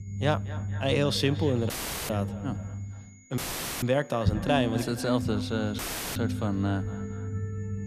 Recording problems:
echo of what is said; noticeable; throughout; 230 ms later, 15 dB below the speech
background music; loud; from 3 s on; 7 dB below the speech
low rumble; noticeable; throughout; 15 dB below the speech
high-pitched whine; faint; throughout; 6.5 kHz, 30 dB below the speech
audio cutting out; filled with static; at 1.5 s, at 3.5 s and at 6 s

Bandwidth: 14.5 kHz